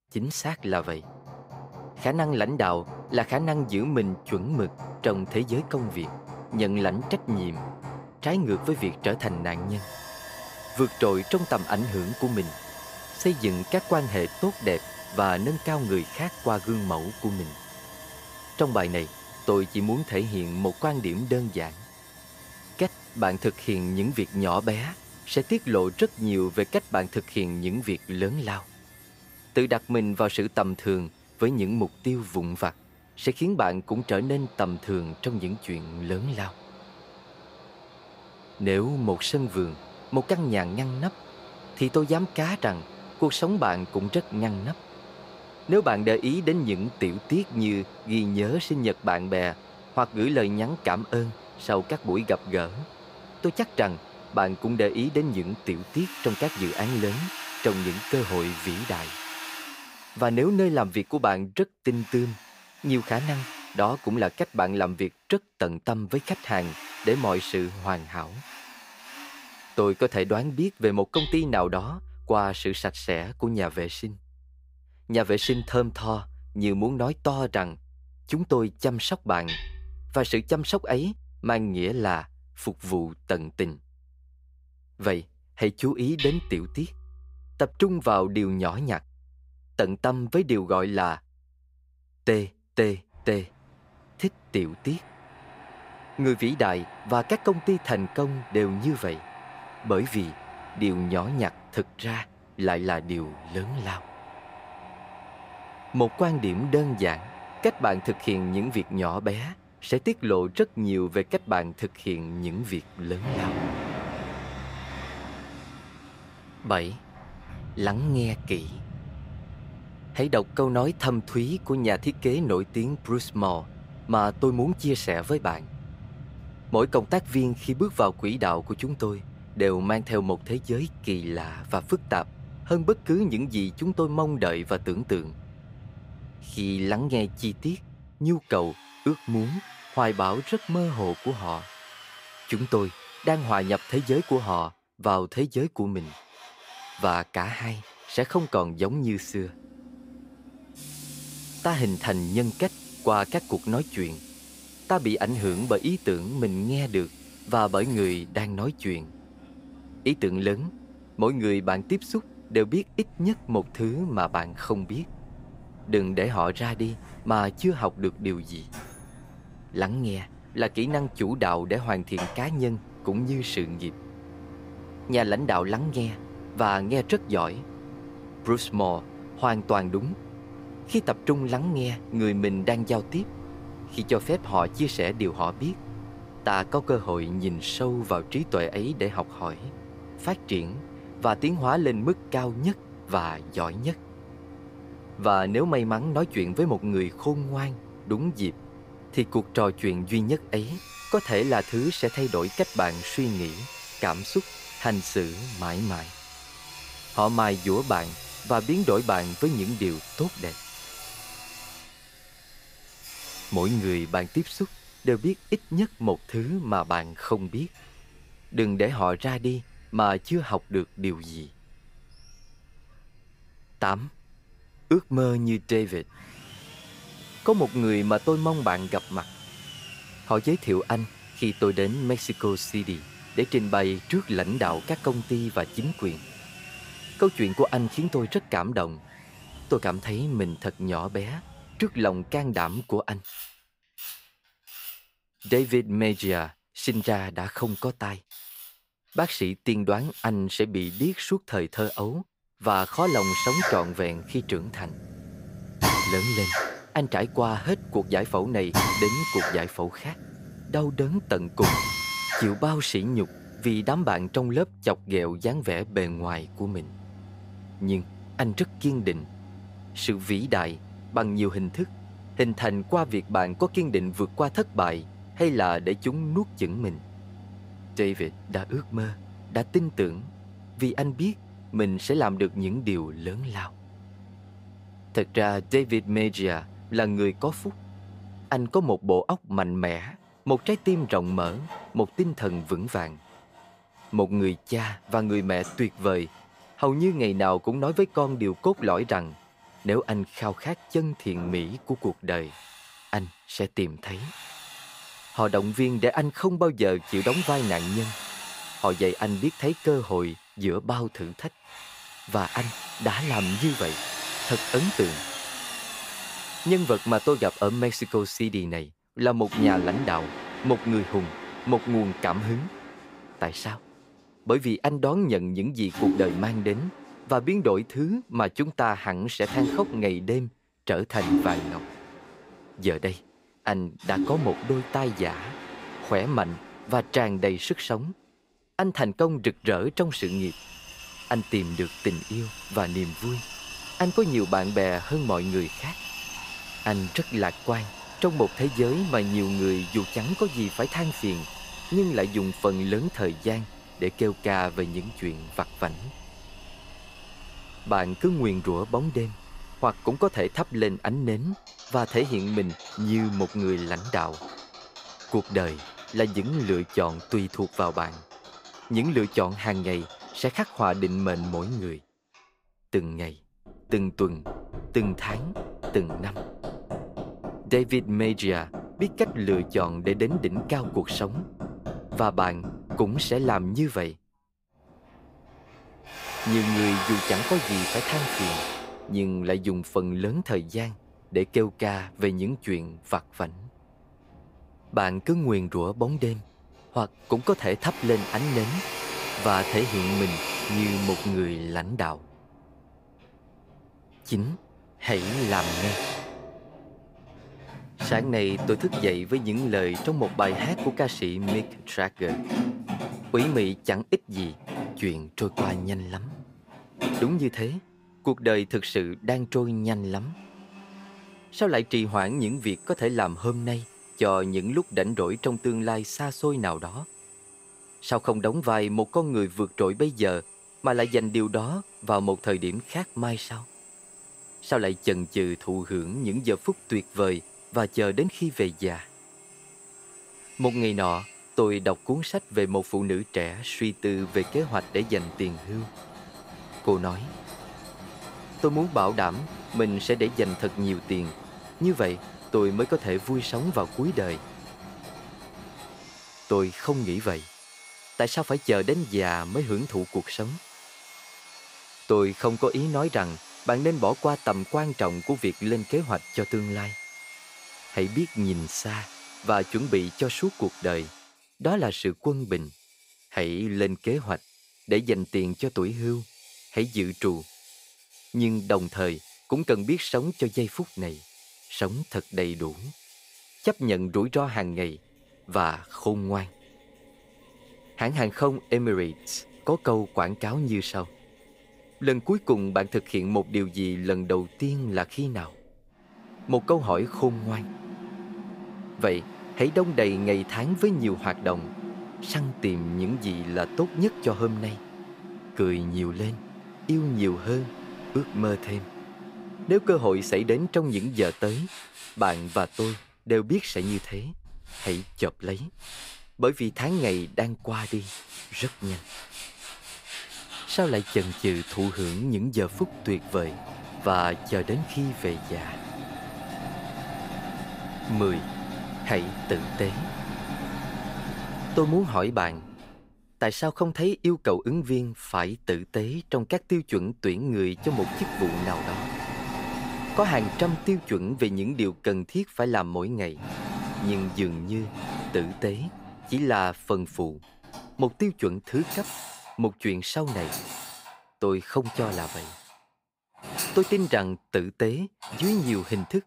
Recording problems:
machinery noise; noticeable; throughout; 10 dB below the speech

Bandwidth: 15.5 kHz